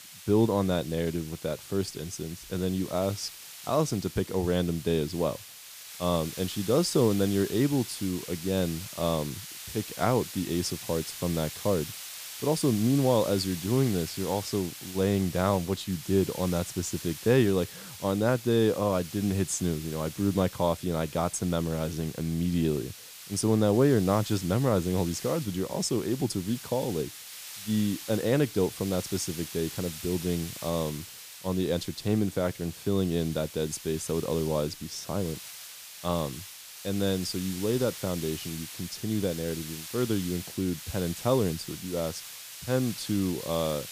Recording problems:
hiss; noticeable; throughout; 10 dB below the speech

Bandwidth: 15 kHz